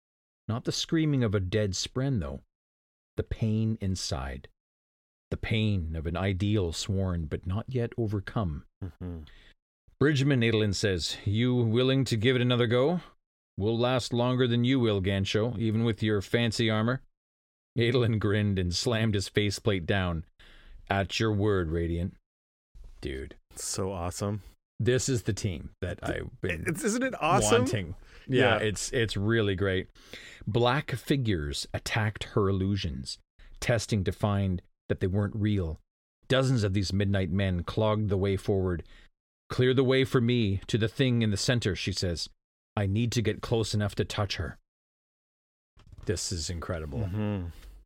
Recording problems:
none

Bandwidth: 16.5 kHz